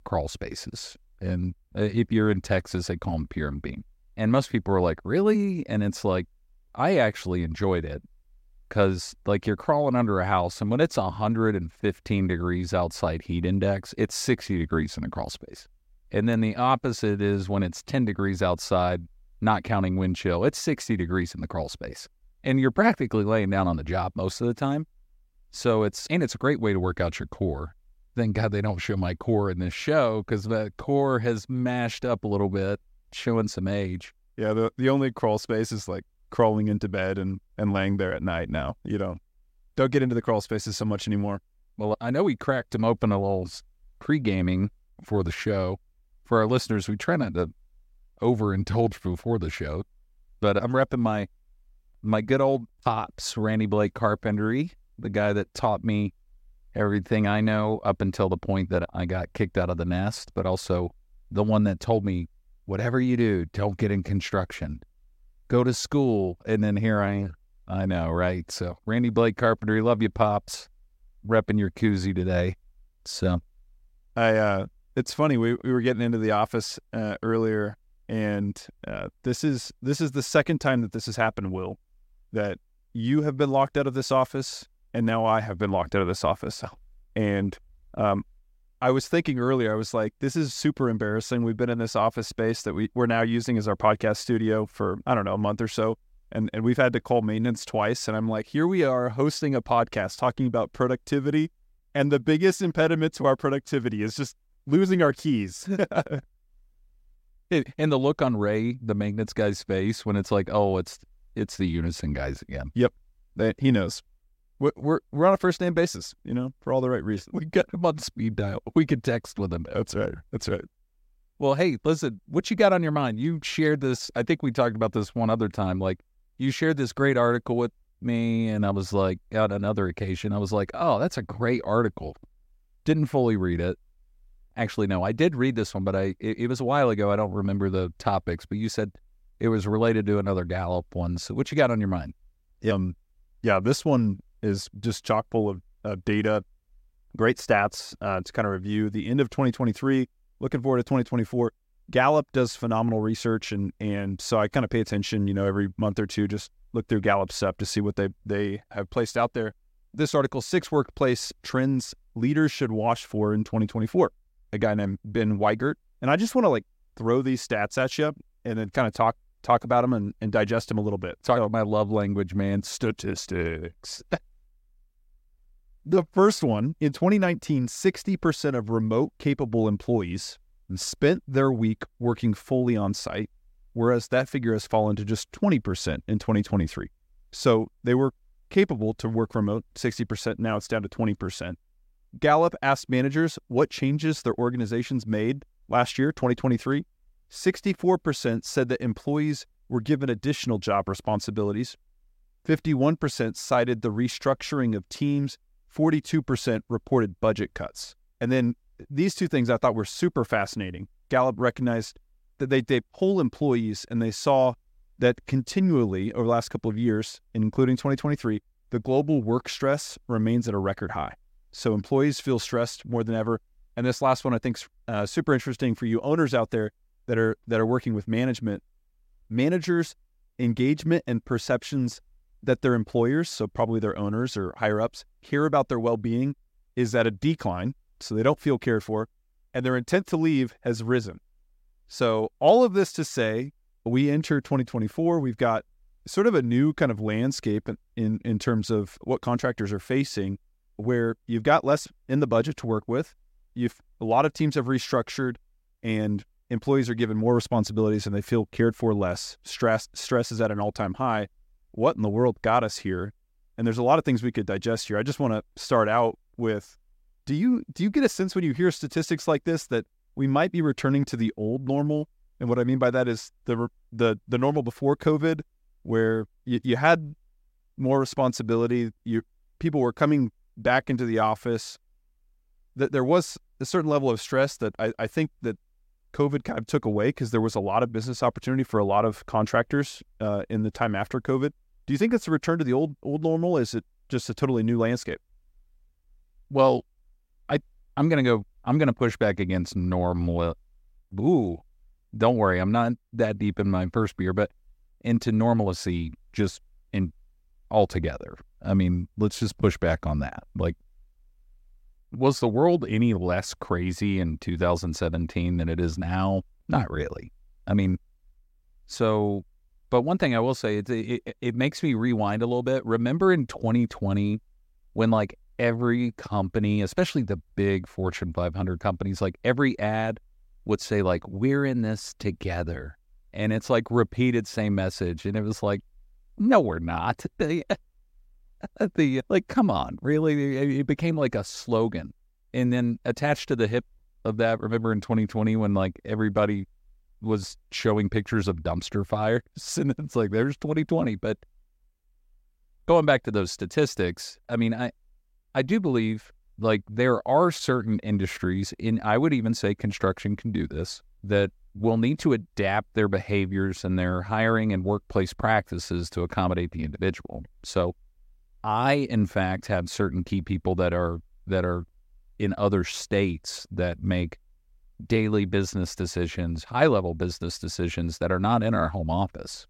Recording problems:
none

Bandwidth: 16 kHz